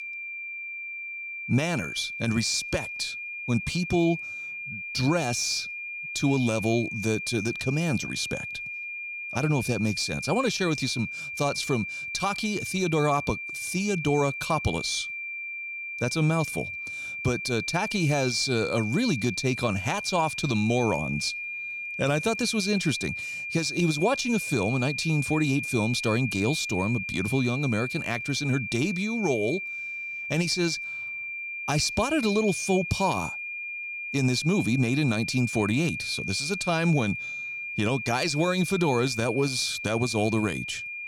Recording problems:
high-pitched whine; loud; throughout; 2.5 kHz, 5 dB below the speech

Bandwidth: 18.5 kHz